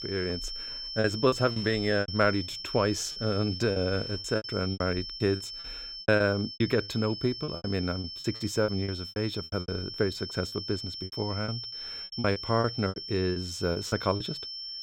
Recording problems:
high-pitched whine; loud; throughout; 5.5 kHz, 7 dB below the speech
choppy; very; 14% of the speech affected

